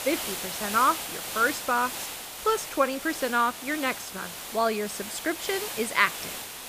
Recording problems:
hiss; loud; throughout; 7 dB below the speech

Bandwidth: 15 kHz